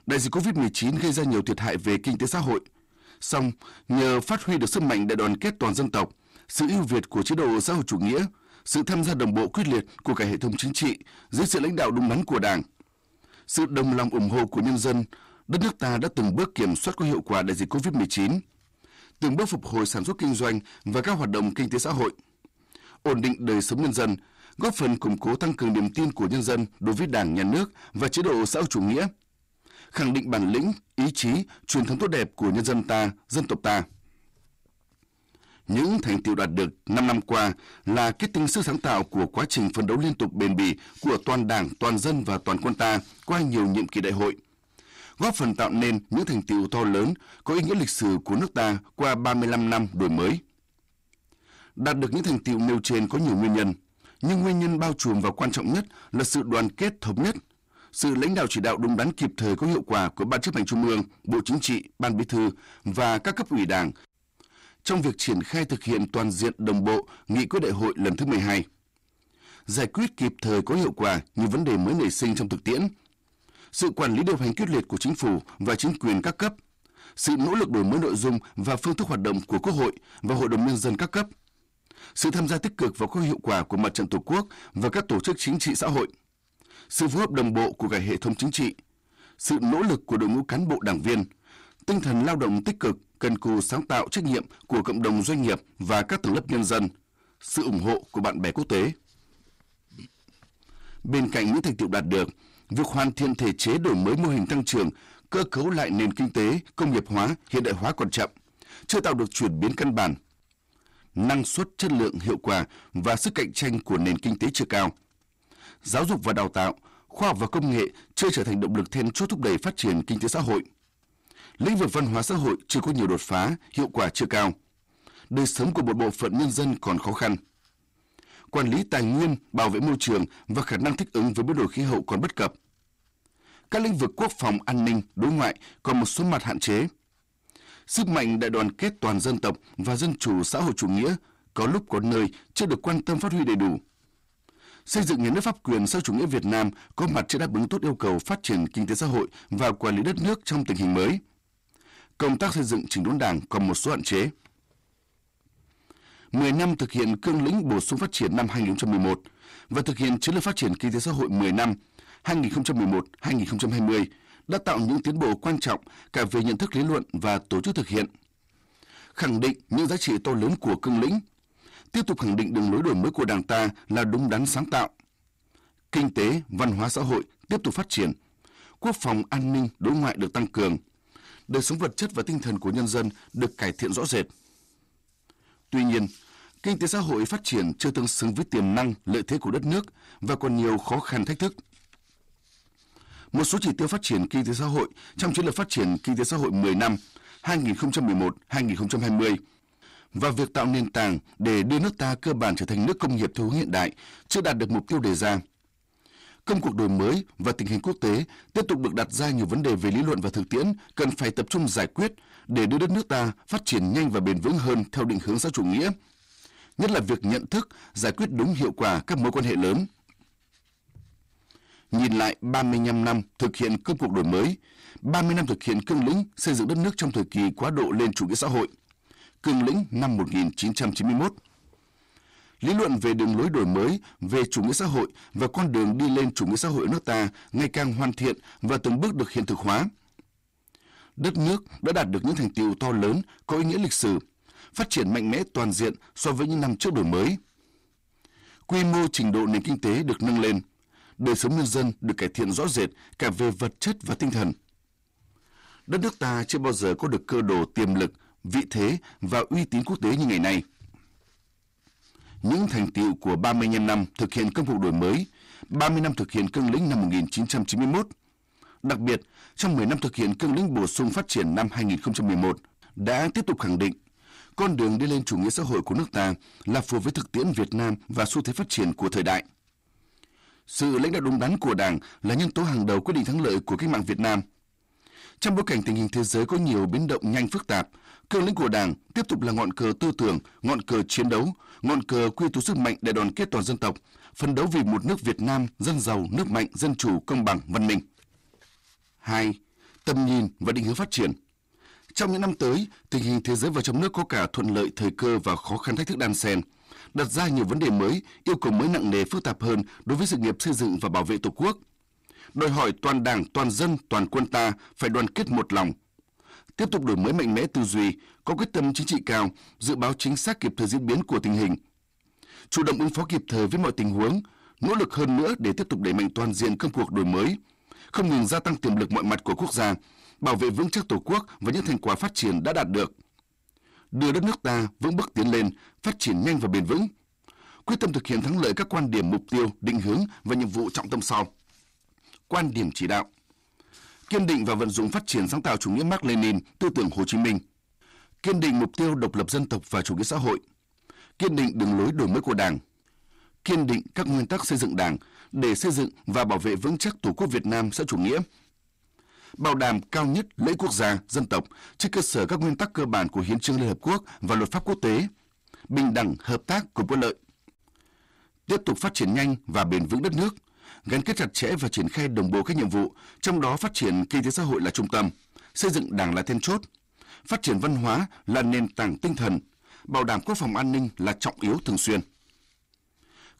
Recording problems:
distortion; heavy; 7 dB below the speech

